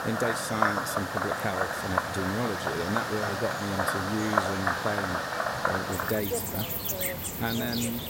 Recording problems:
animal sounds; very loud; throughout; 3 dB above the speech

